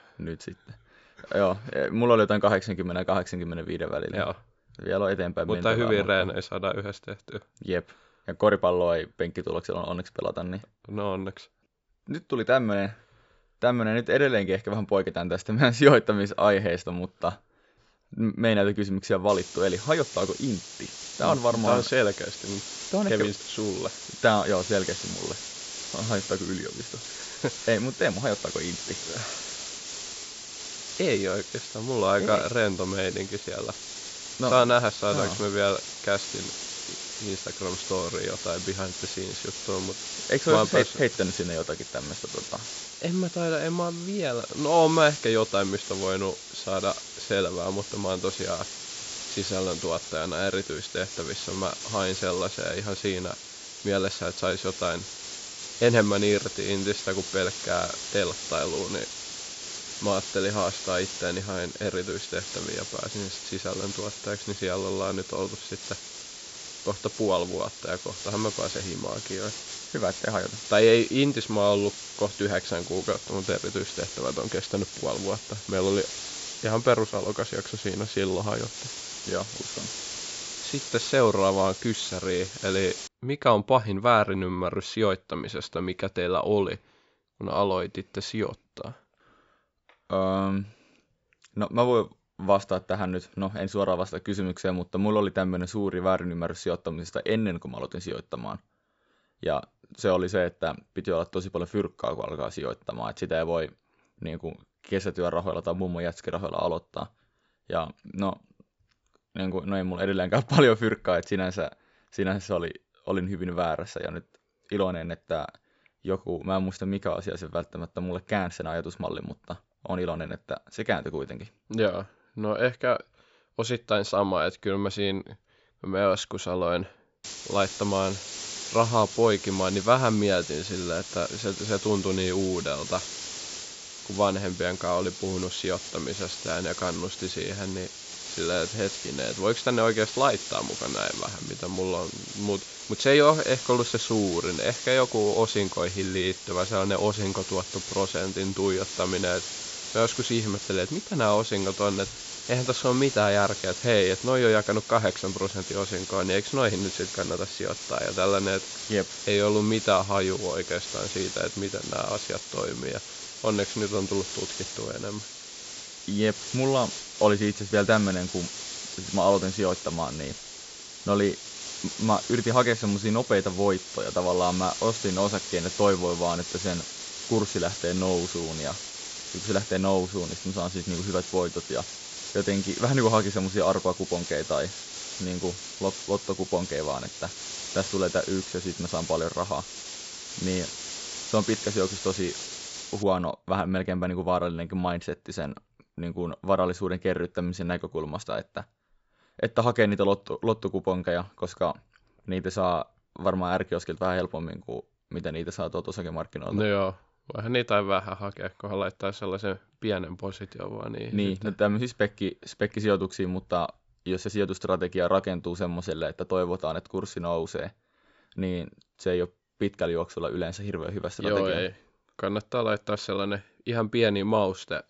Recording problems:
high frequencies cut off; noticeable; nothing above 8 kHz
hiss; loud; from 19 s to 1:23 and from 2:07 to 3:13; 8 dB below the speech

